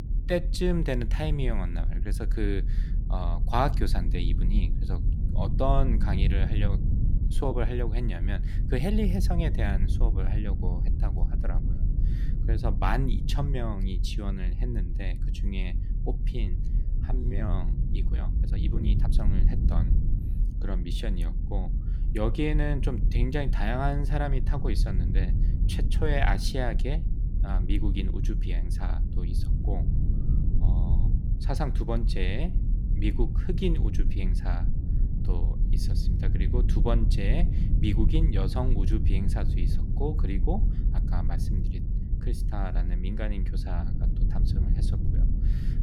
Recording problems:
low rumble; loud; throughout; 9 dB below the speech
uneven, jittery; strongly; from 7 to 19 s

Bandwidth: 17.5 kHz